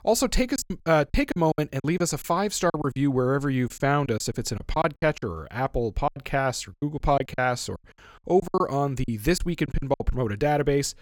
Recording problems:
choppy; very; 13% of the speech affected

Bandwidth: 17 kHz